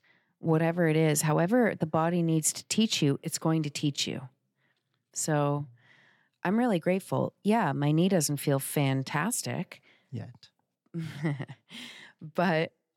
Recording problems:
none

